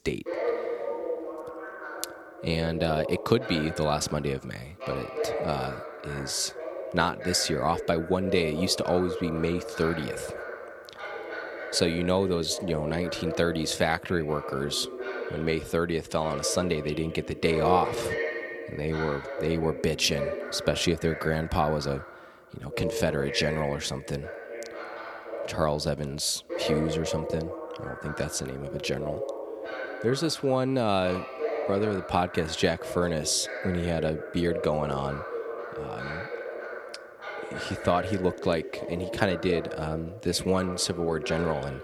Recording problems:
voice in the background; loud; throughout; 7 dB below the speech

